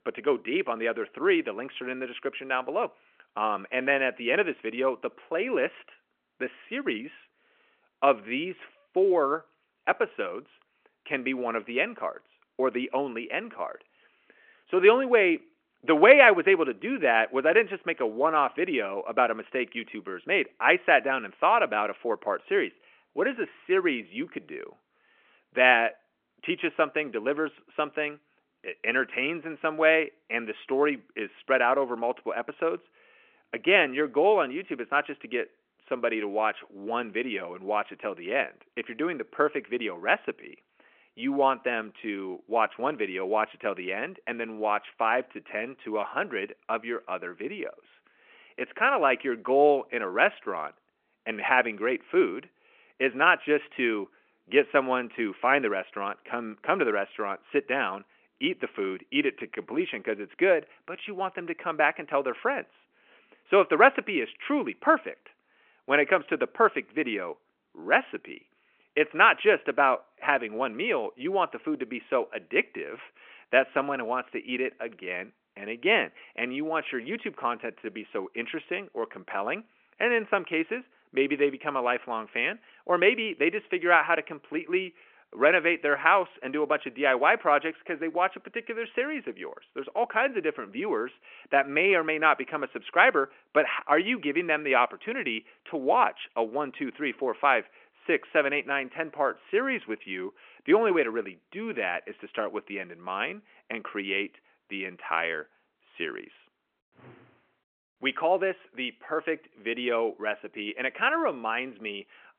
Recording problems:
phone-call audio

